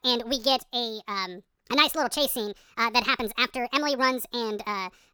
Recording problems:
wrong speed and pitch; too fast and too high; 1.6 times normal speed

